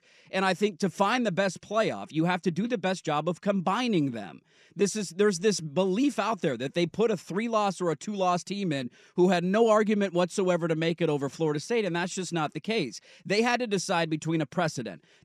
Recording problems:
none

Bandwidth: 14 kHz